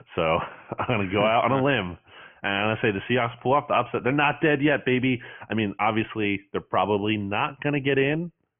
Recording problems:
high frequencies cut off; severe; nothing above 3 kHz

